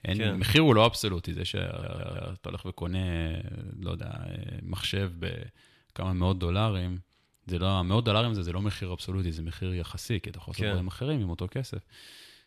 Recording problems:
audio stuttering; at 1.5 s

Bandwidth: 13.5 kHz